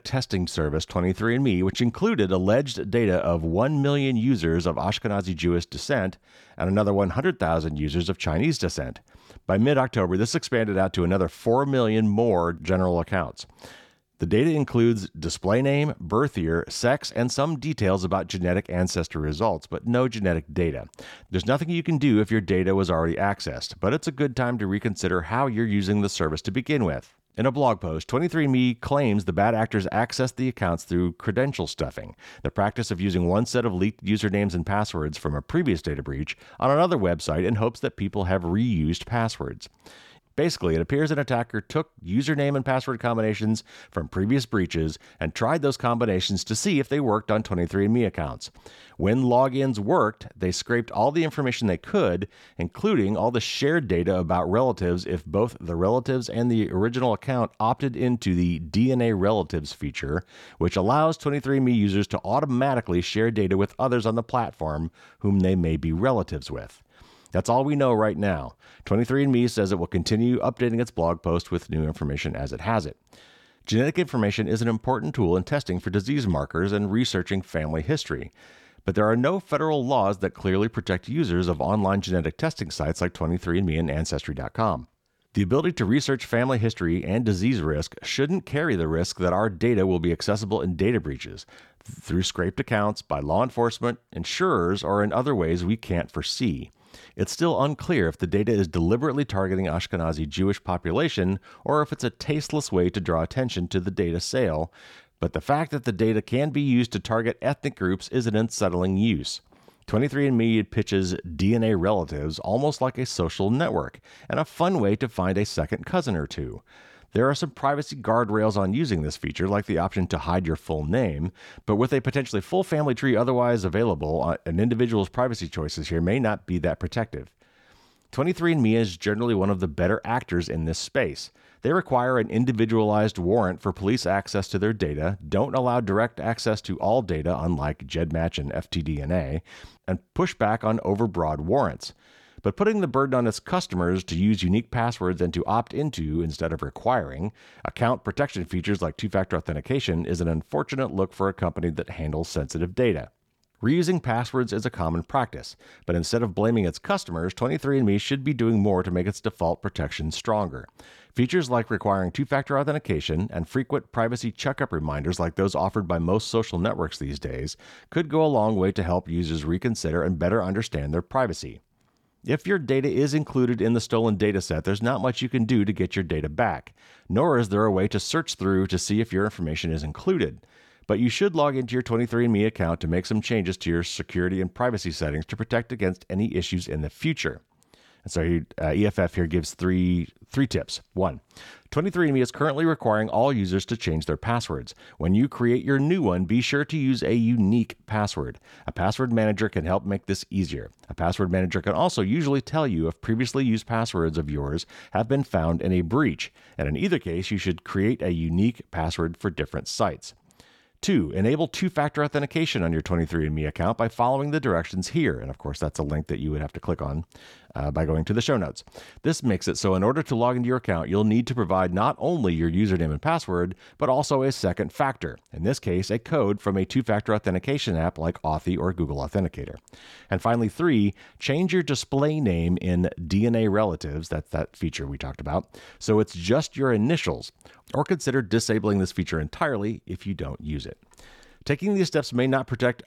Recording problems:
none

